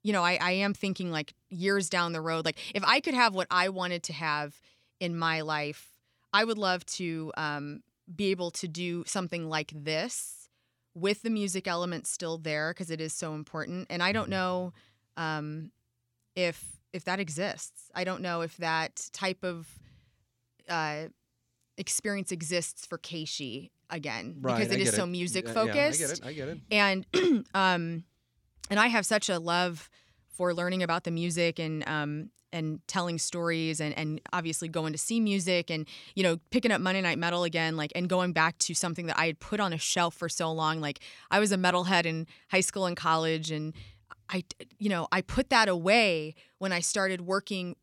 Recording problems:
none

